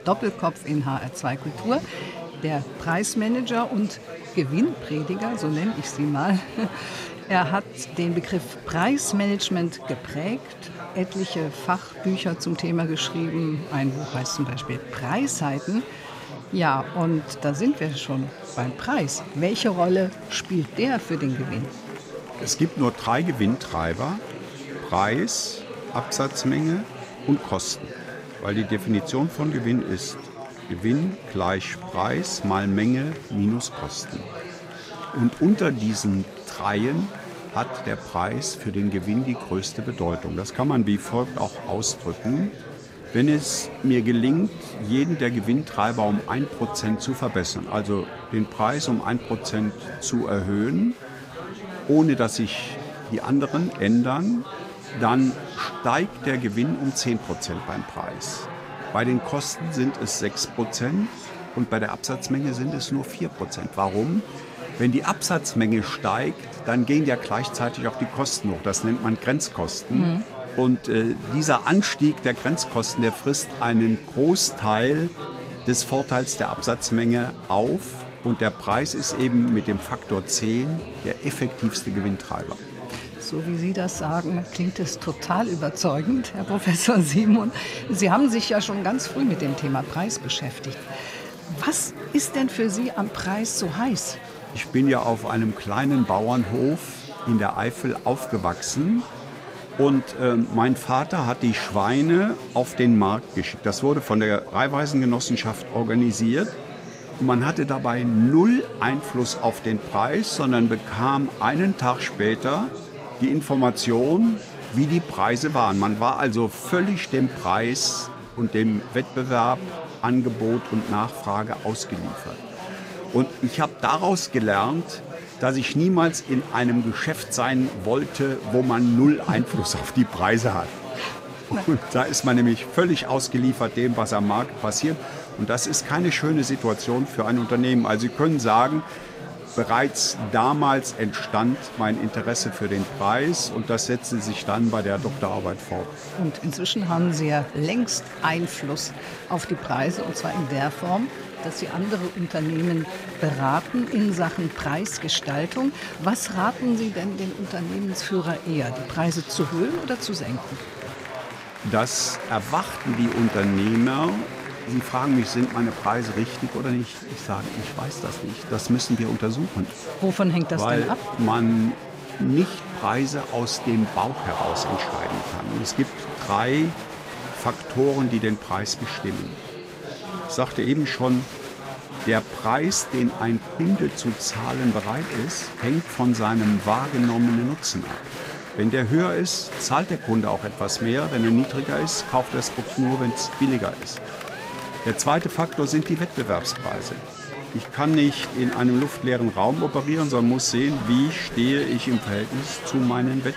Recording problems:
chatter from many people; noticeable; throughout; 10 dB below the speech

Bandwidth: 15.5 kHz